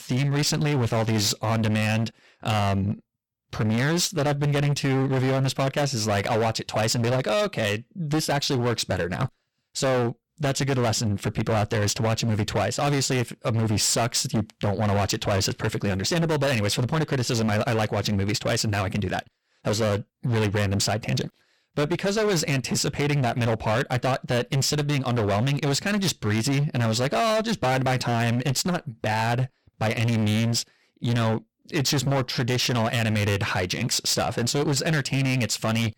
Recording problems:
distortion; heavy; 23% of the sound clipped

